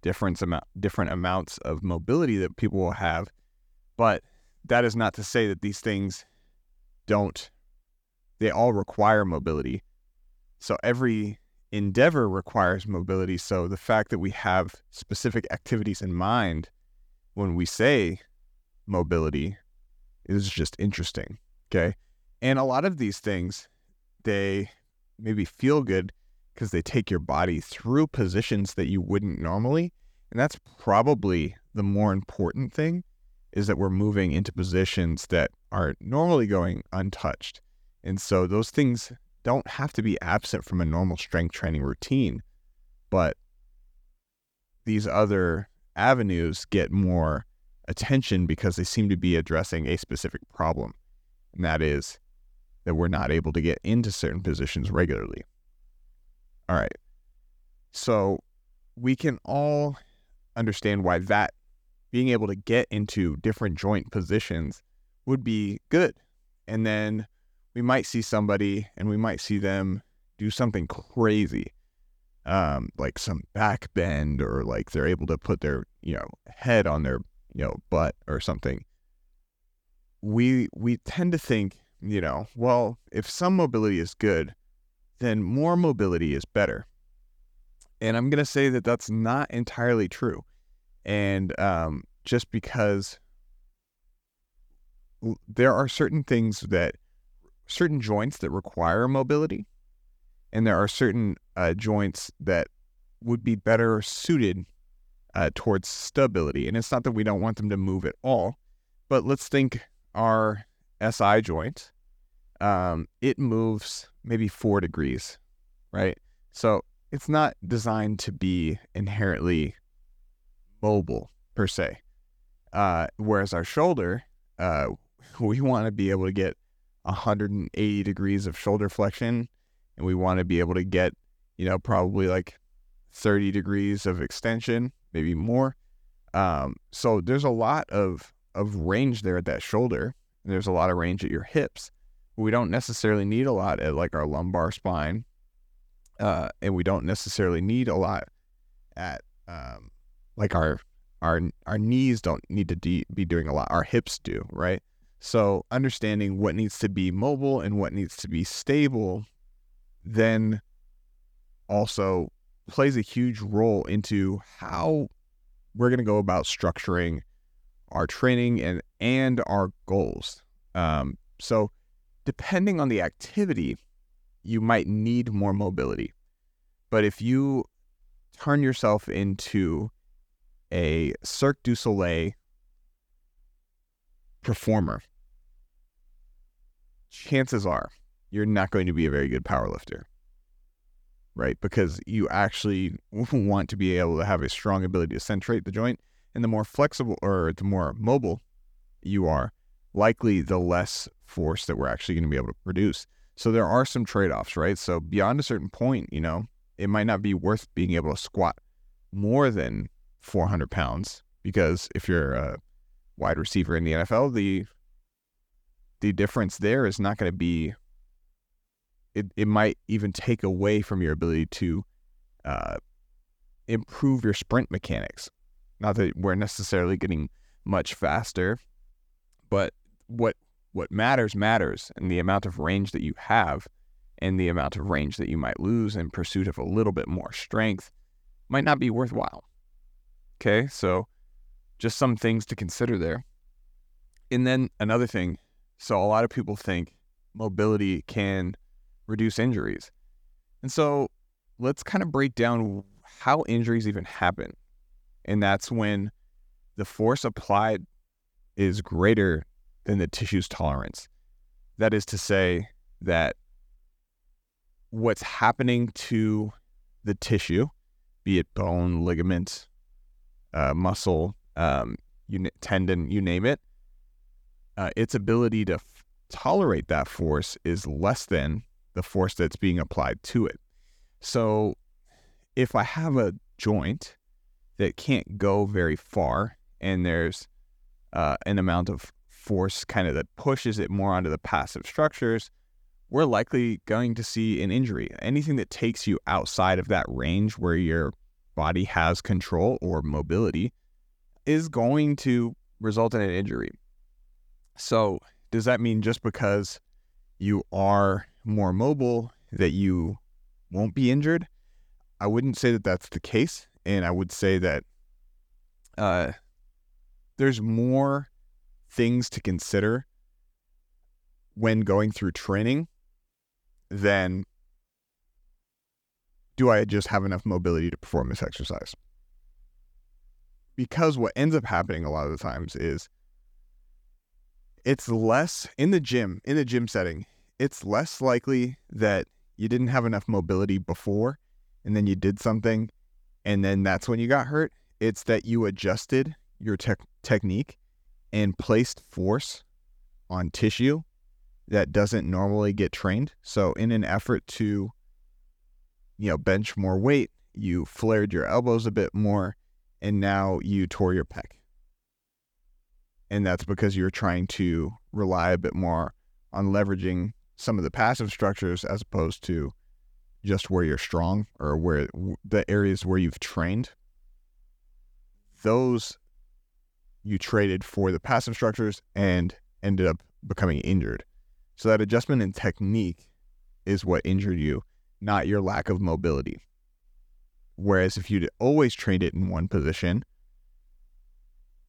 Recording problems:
none

